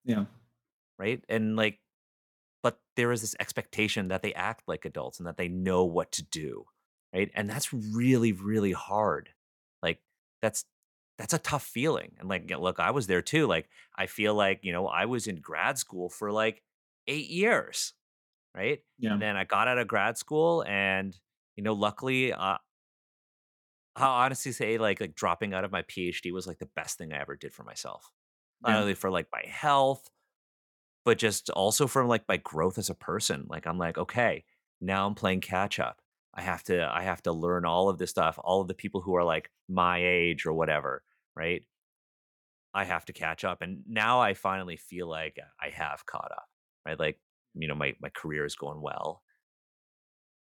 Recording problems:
none

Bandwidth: 17.5 kHz